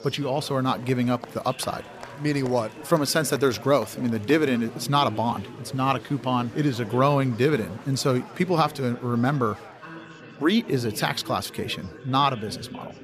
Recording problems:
chatter from many people; noticeable; throughout; 15 dB below the speech

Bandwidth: 15 kHz